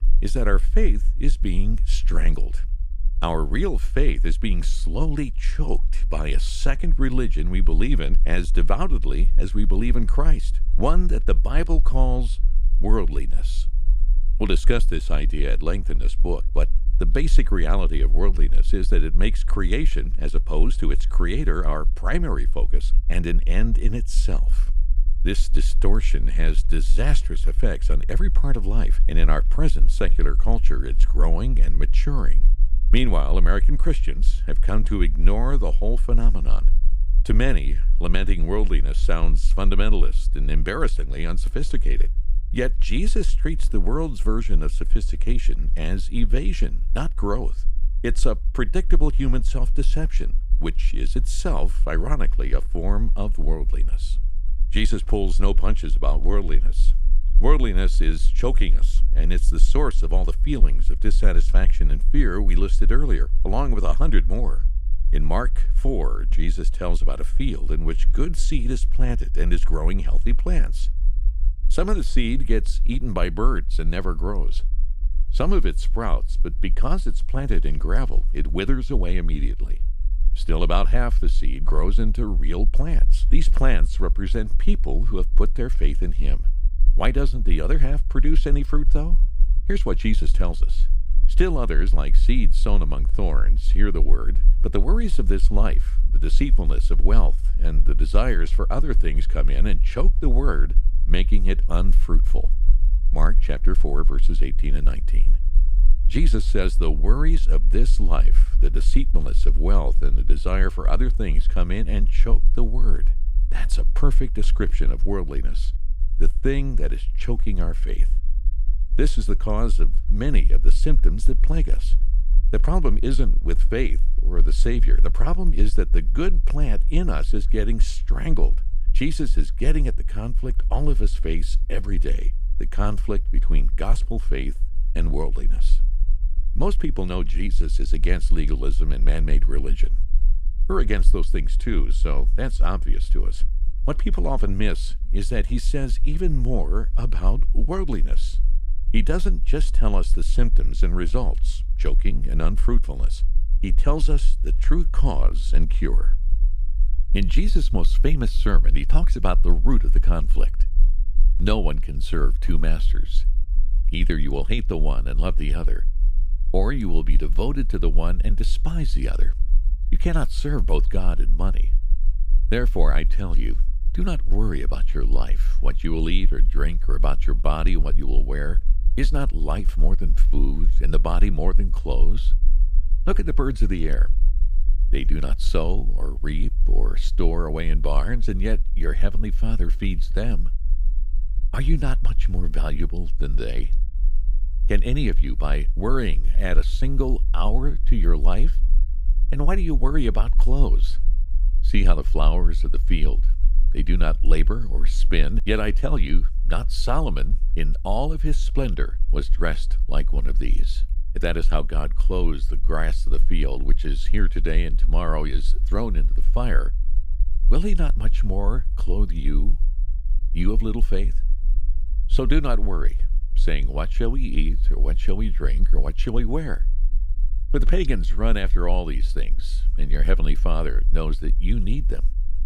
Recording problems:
low rumble; faint; throughout; 20 dB below the speech

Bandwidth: 15.5 kHz